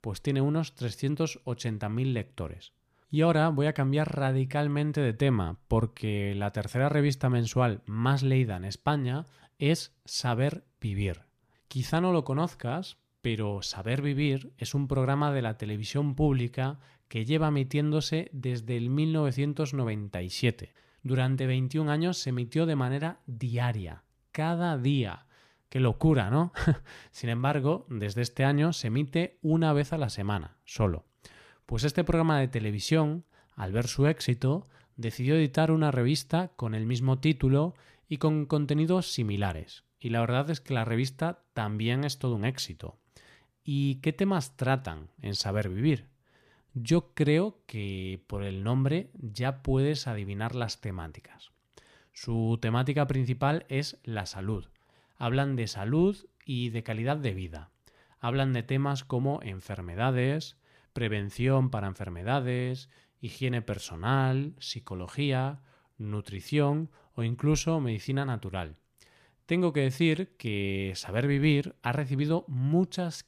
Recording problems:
none

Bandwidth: 14.5 kHz